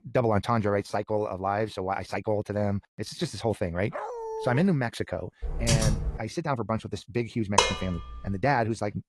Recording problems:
wrong speed, natural pitch; too fast; 1.5 times normal speed
garbled, watery; slightly; nothing above 11.5 kHz
dog barking; noticeable; at 4 s; peak 5 dB below the speech
keyboard typing; loud; at 5.5 s; peak 4 dB above the speech
clattering dishes; loud; at 7.5 s; peak 5 dB above the speech

